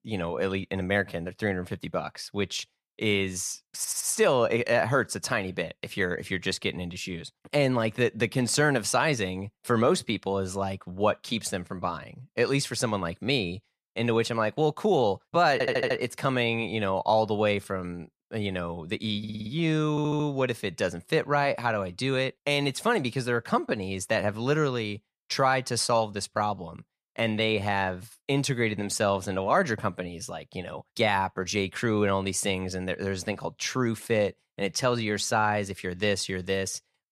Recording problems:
audio stuttering; 4 times, first at 4 s

